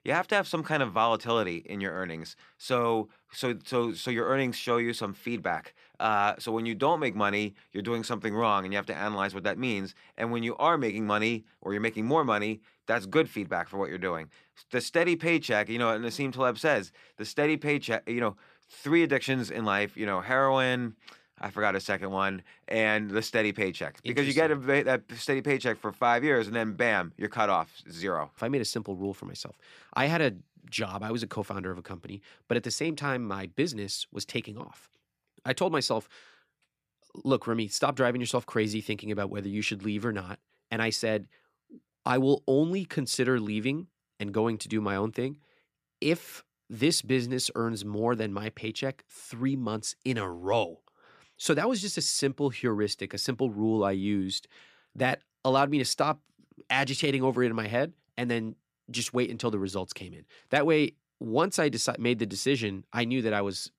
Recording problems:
none

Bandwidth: 14.5 kHz